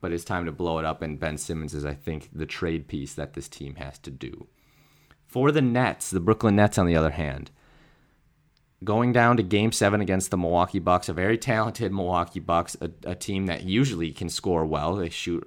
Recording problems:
none

